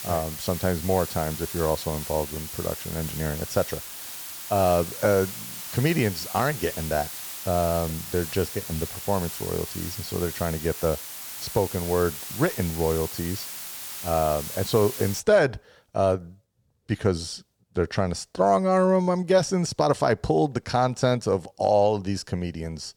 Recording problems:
hiss; loud; until 15 s; 8 dB below the speech

